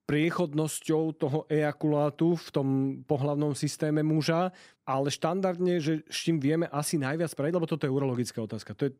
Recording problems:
none

